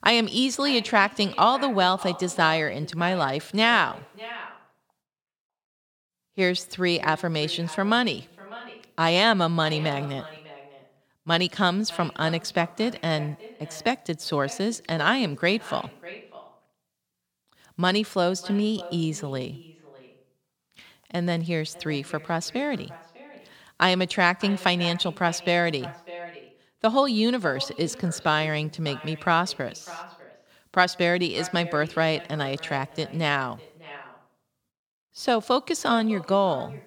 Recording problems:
echo of what is said; noticeable; throughout; 600 ms later, 20 dB below the speech

